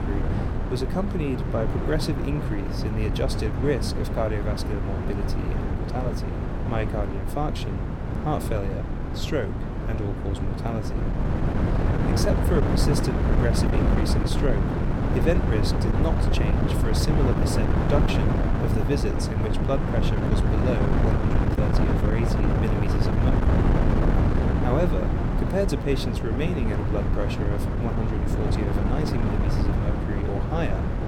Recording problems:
wind noise on the microphone; heavy; as loud as the speech

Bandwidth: 17 kHz